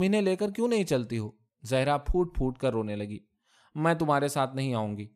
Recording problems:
abrupt cut into speech; at the start

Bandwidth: 15 kHz